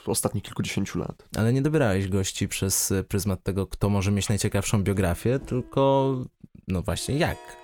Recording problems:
background music; faint; from 5 s on; 25 dB below the speech

